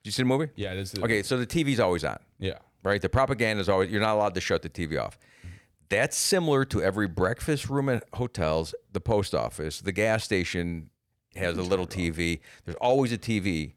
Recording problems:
none

